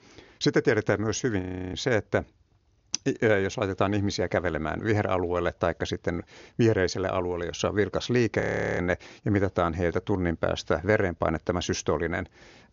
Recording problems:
high frequencies cut off; noticeable; nothing above 7 kHz
audio freezing; at 1.5 s and at 8.5 s

